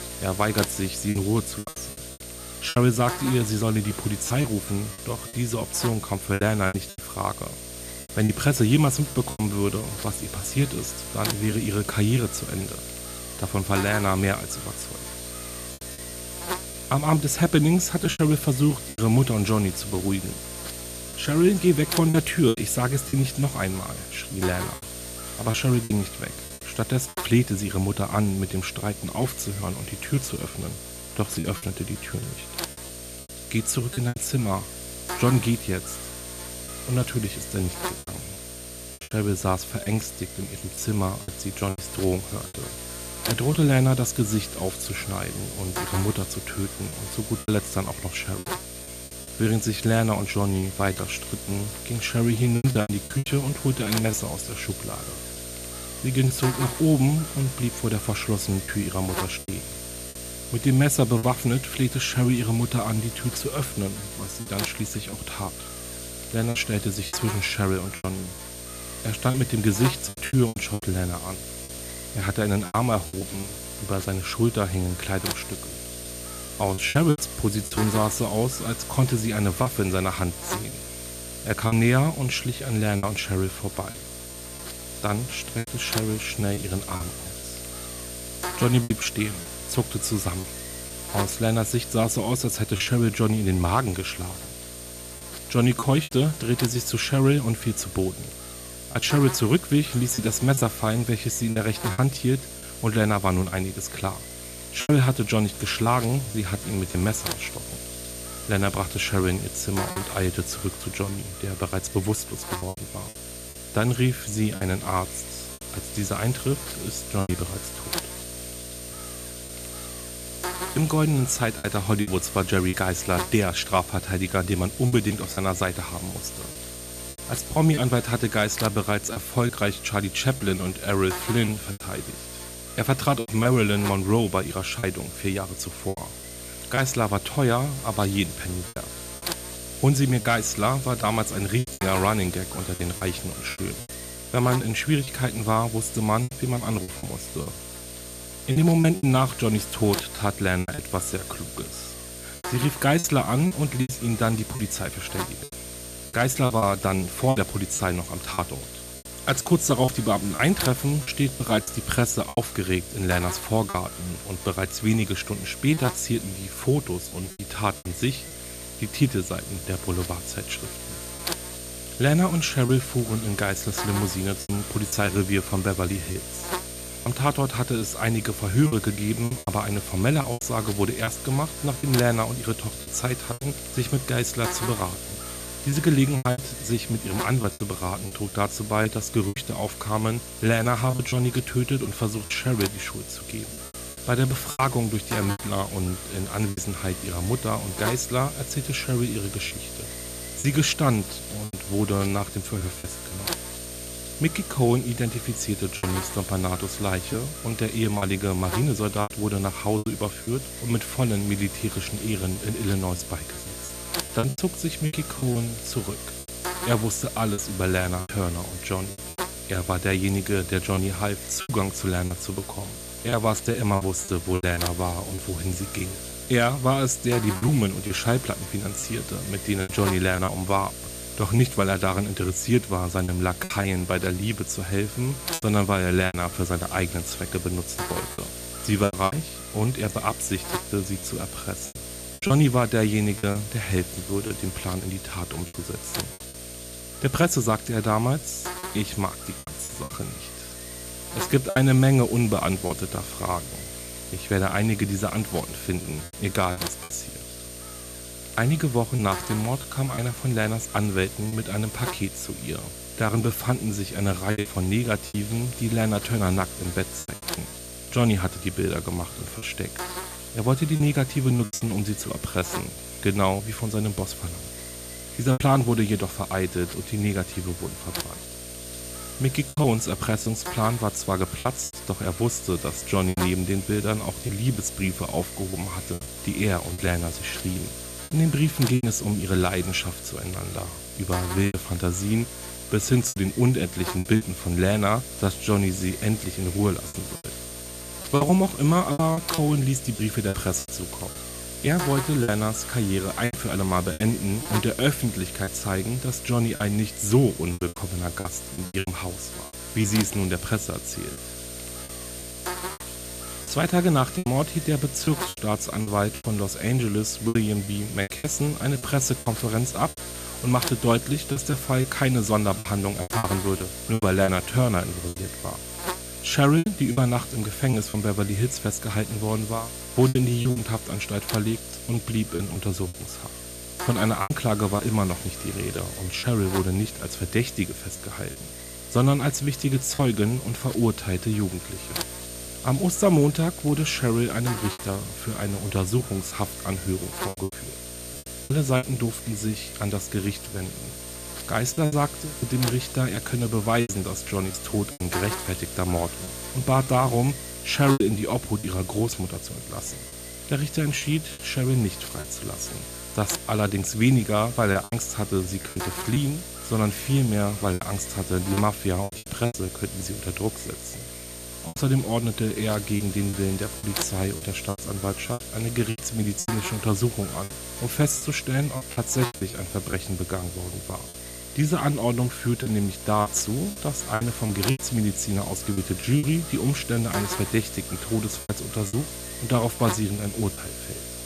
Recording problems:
electrical hum; loud; throughout; 60 Hz, 8 dB below the speech
choppy; very; 6% of the speech affected

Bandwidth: 14.5 kHz